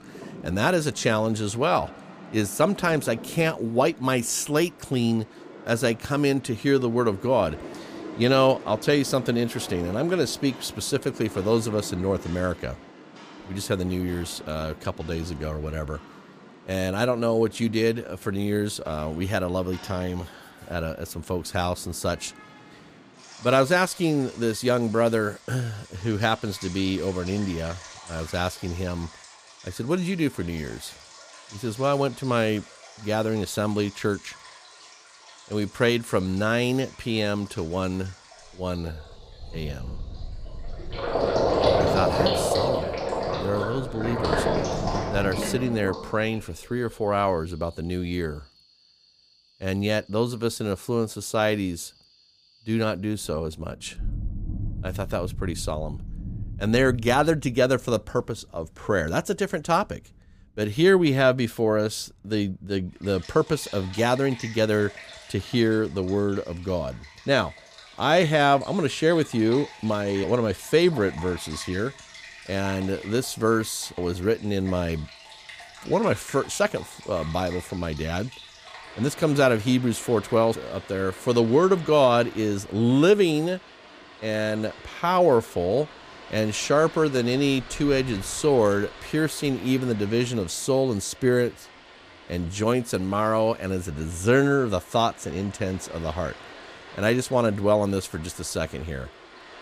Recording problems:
rain or running water; noticeable; throughout; 10 dB below the speech

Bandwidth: 15 kHz